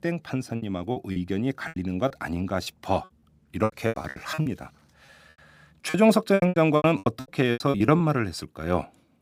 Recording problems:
choppy; very; from 0.5 to 4.5 s and from 6 to 8 s; 21% of the speech affected

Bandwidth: 15.5 kHz